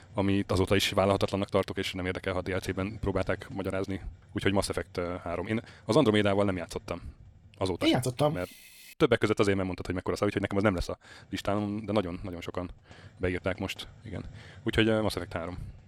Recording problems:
wrong speed, natural pitch; too fast; 1.5 times normal speed
hiss; faint; until 8.5 s and from 11 s on; 25 dB below the speech

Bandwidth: 17.5 kHz